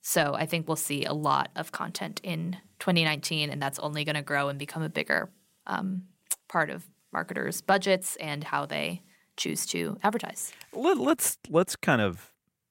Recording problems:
none

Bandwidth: 16 kHz